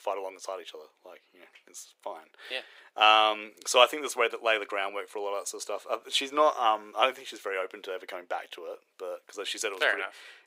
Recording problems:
thin; very; fading below 450 Hz

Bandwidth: 15.5 kHz